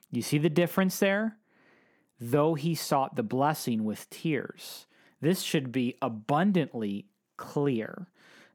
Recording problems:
none

